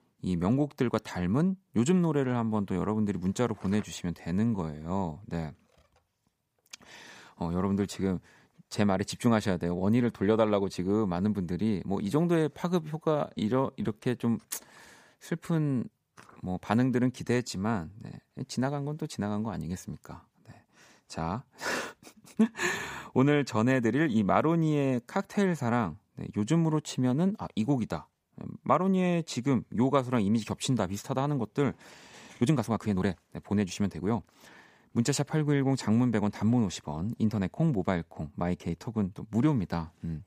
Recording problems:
uneven, jittery; strongly; from 4 to 34 s

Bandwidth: 15 kHz